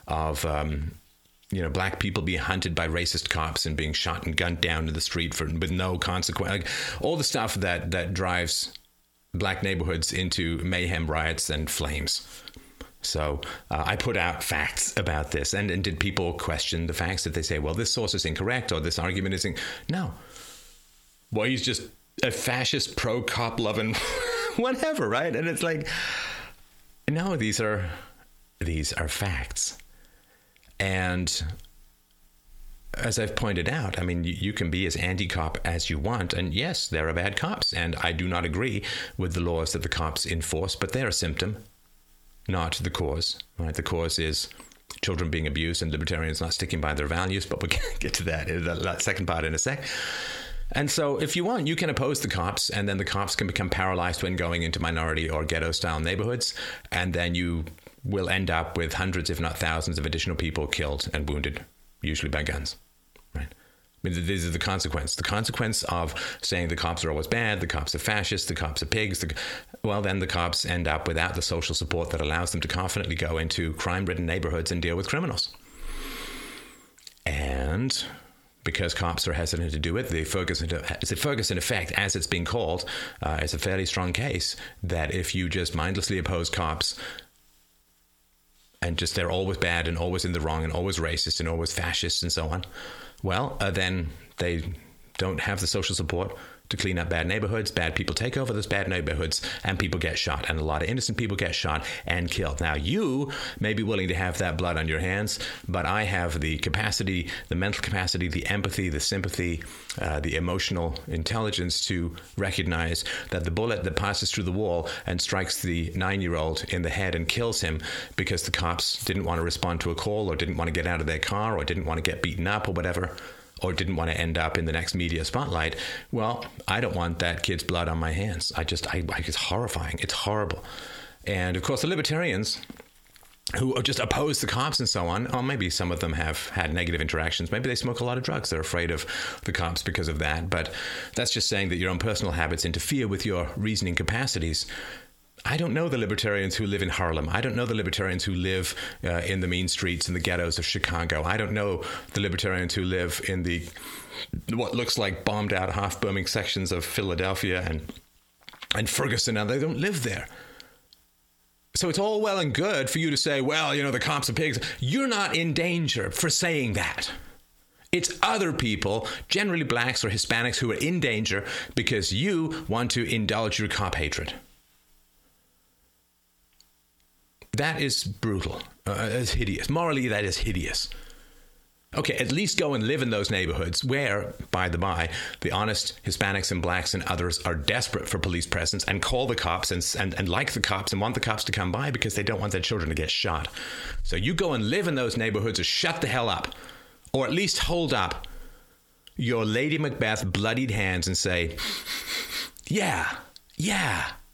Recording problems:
squashed, flat; heavily

